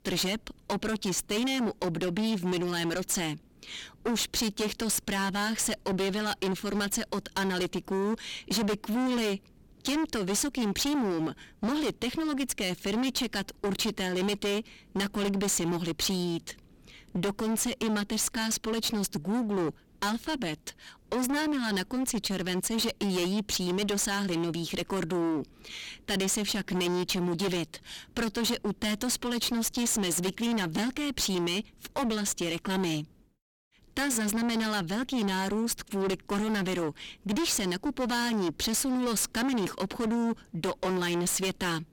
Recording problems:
distortion; heavy; 29% of the sound clipped

